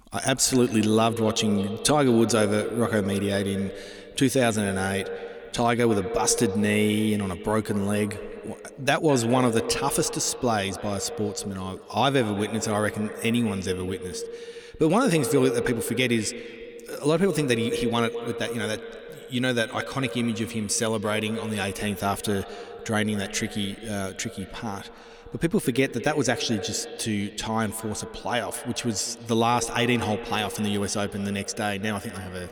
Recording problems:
echo of what is said; strong; throughout; 210 ms later, 10 dB below the speech

